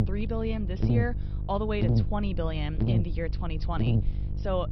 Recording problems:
high frequencies cut off; noticeable; nothing above 5.5 kHz
electrical hum; loud; throughout; 50 Hz, 5 dB below the speech
low rumble; faint; throughout; 25 dB below the speech

